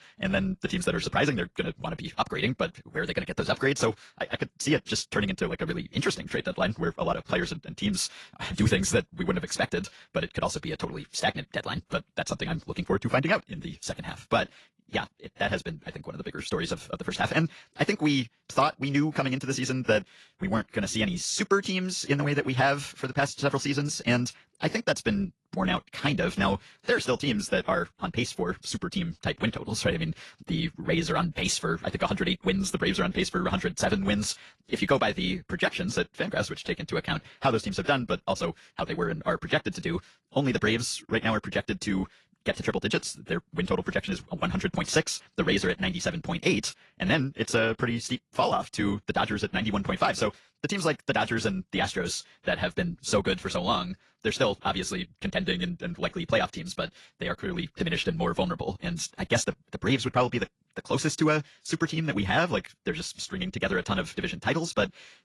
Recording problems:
wrong speed, natural pitch; too fast; 1.6 times normal speed
garbled, watery; slightly; nothing above 11 kHz

